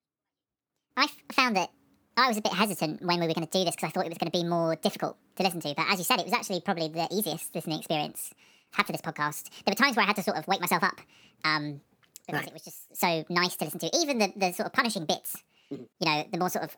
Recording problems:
wrong speed and pitch; too fast and too high; 1.5 times normal speed

